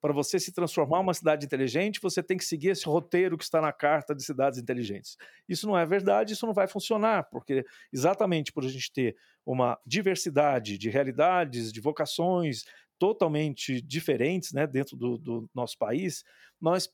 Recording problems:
none

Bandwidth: 18.5 kHz